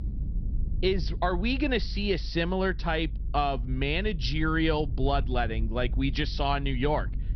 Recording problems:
high frequencies cut off; noticeable; nothing above 5.5 kHz
low rumble; faint; throughout; 20 dB below the speech

